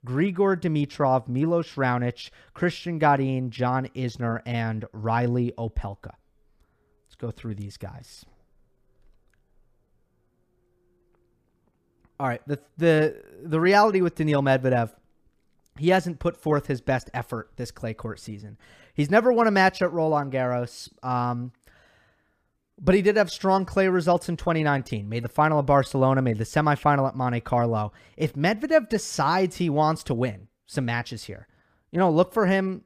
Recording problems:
none

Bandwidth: 15 kHz